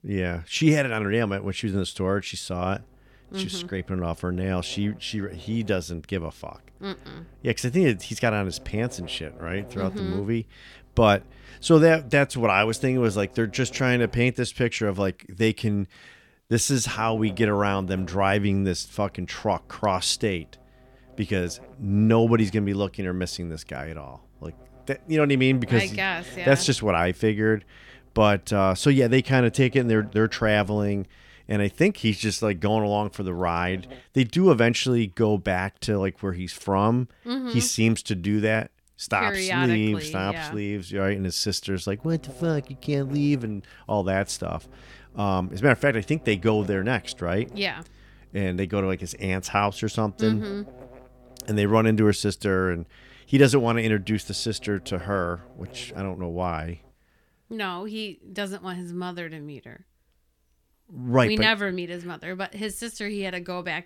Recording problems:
electrical hum; faint; from 2.5 to 14 s, from 17 to 34 s and from 42 to 57 s; 50 Hz, 25 dB below the speech

